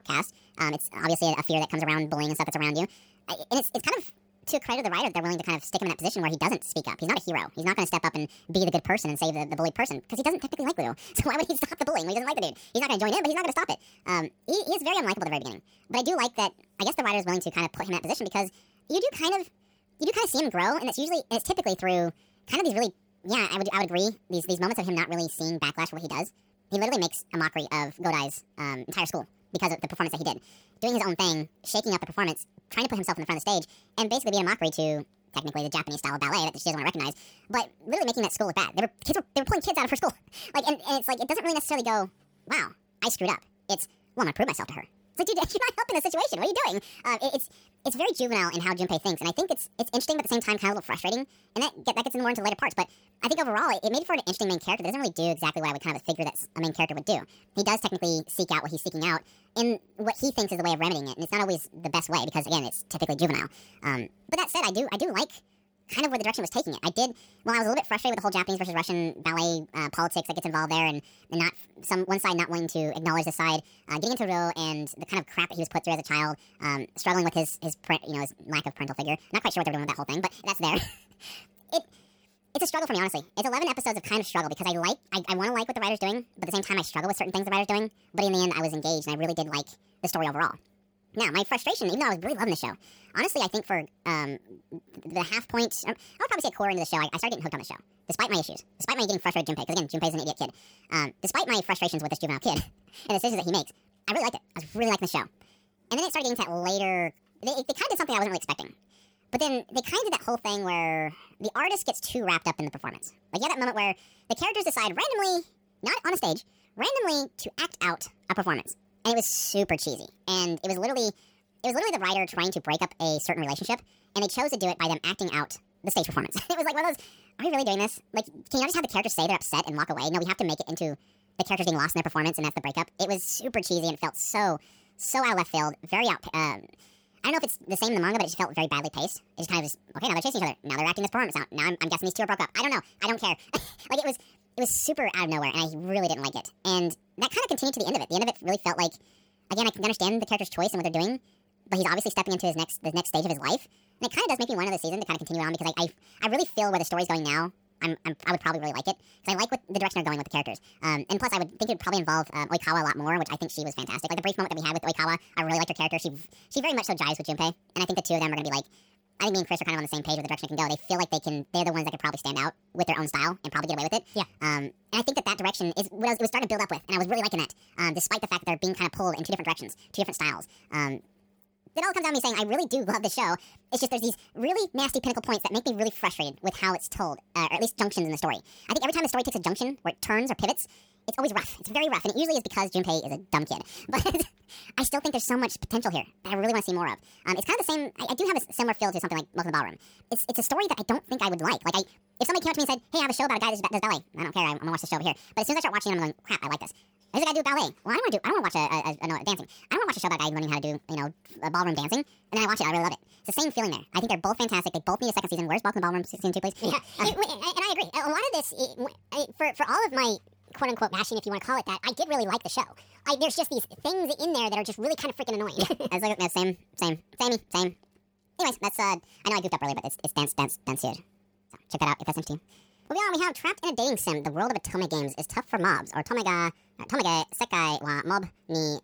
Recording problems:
wrong speed and pitch; too fast and too high; 1.6 times normal speed

